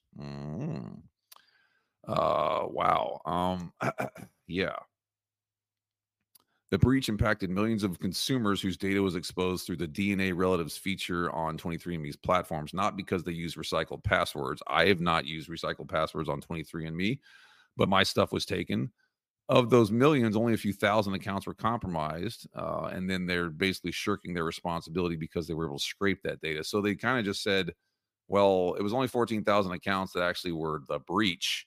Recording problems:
none

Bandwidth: 15 kHz